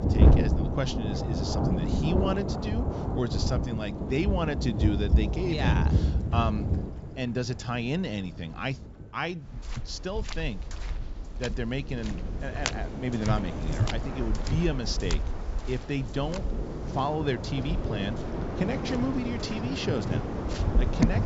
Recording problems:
high frequencies cut off; noticeable; nothing above 8 kHz
rain or running water; very loud; throughout; 2 dB above the speech
electrical hum; faint; throughout; 50 Hz, 25 dB below the speech

